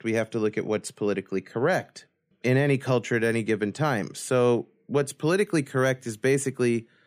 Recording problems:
none

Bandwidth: 15 kHz